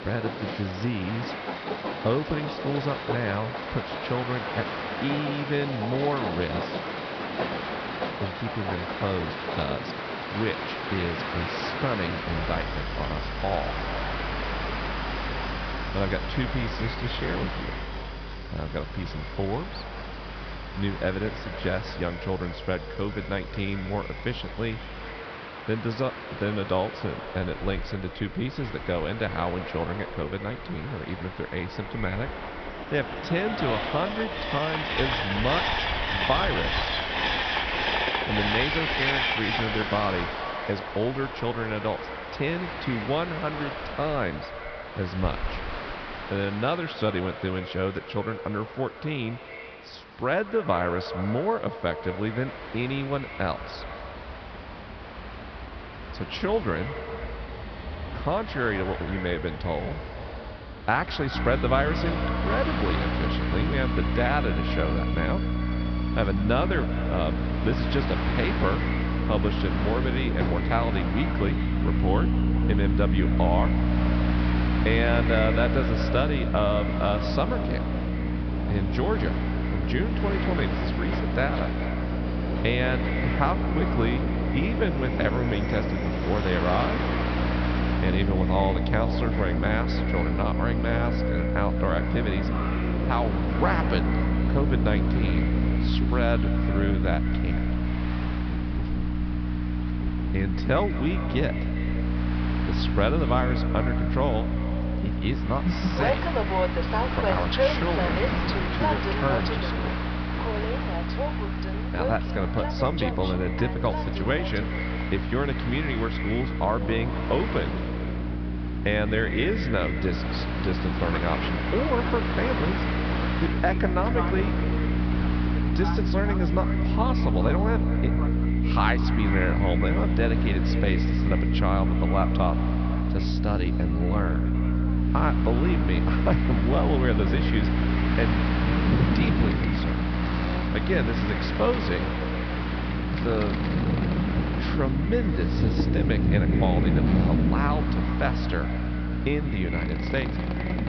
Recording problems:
echo of what is said; strong; throughout; 190 ms later, 10 dB below the speech
high frequencies cut off; noticeable; nothing above 5.5 kHz
electrical hum; loud; from 1:01 on; 60 Hz, 7 dB below the speech
train or aircraft noise; loud; throughout; 3 dB below the speech

